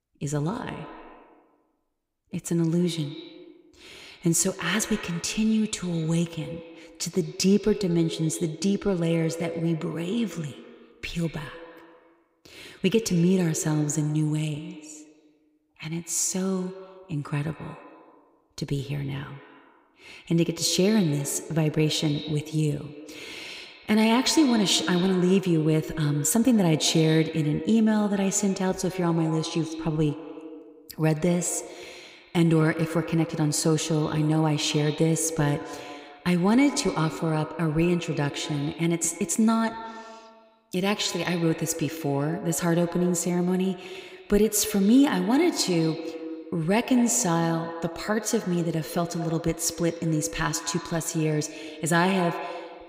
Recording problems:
echo of what is said; noticeable; throughout; 100 ms later, 15 dB below the speech

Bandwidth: 15.5 kHz